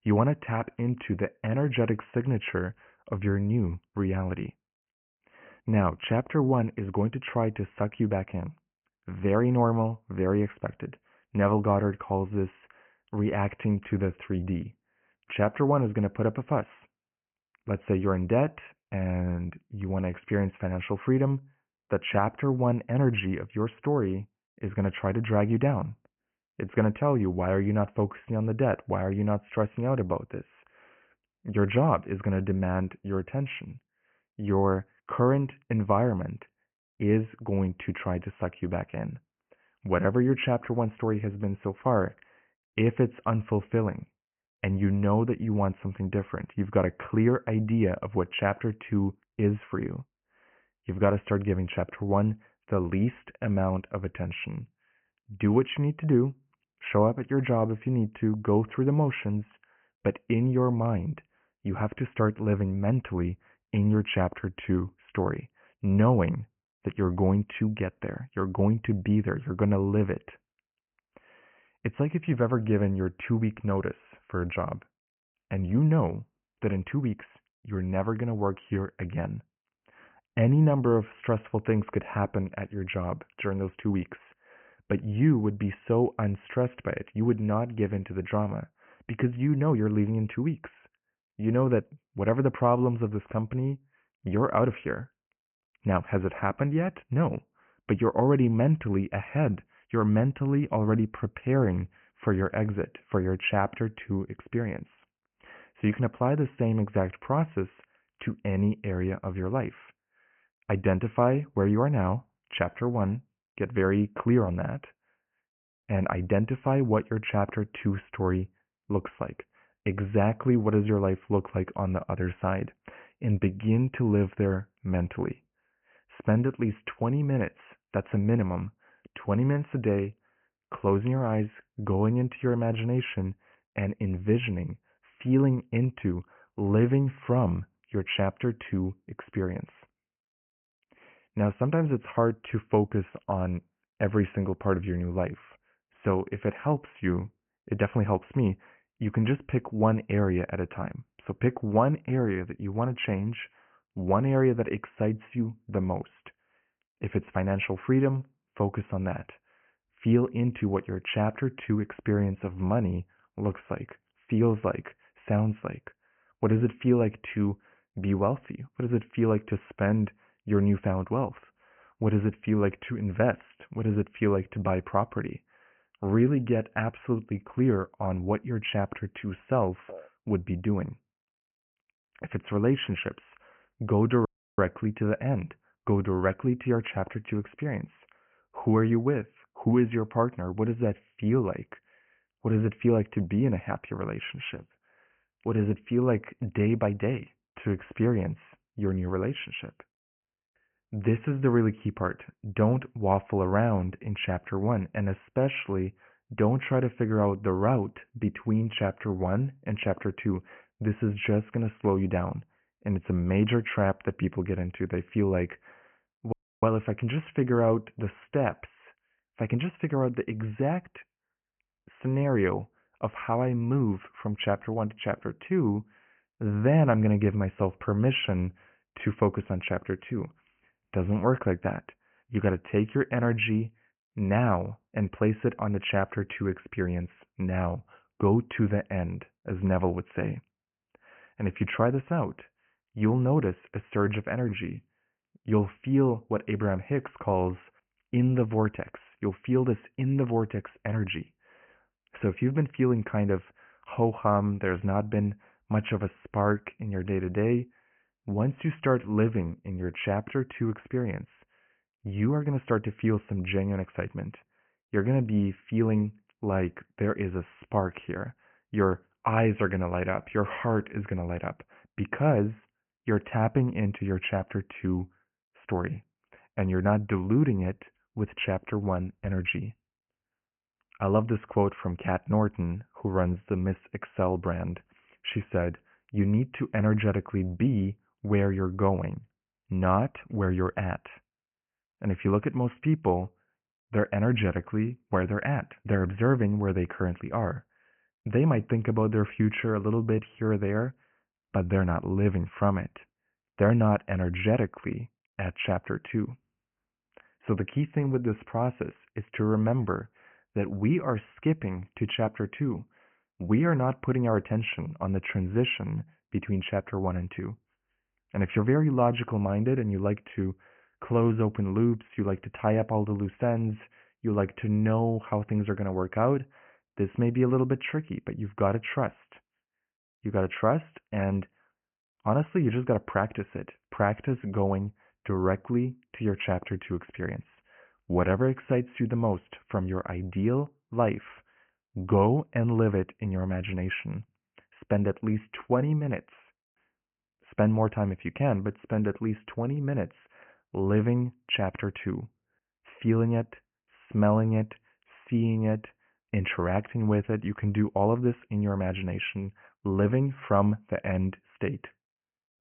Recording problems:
high frequencies cut off; severe; nothing above 3 kHz
audio cutting out; at 3:04 and at 3:36

